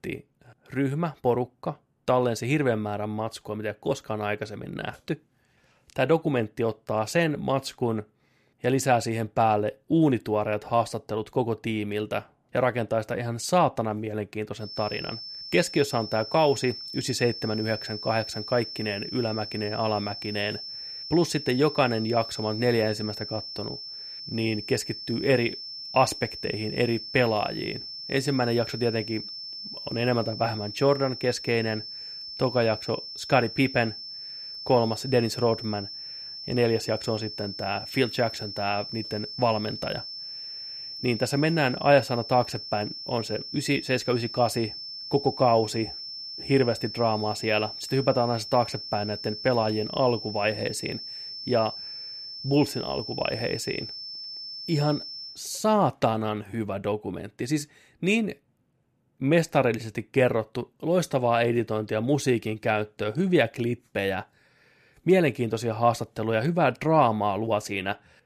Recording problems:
high-pitched whine; loud; from 15 to 55 s; 5.5 kHz, 9 dB below the speech

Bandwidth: 14.5 kHz